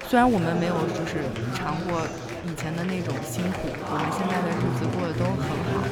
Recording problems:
murmuring crowd; loud; throughout; 1 dB below the speech

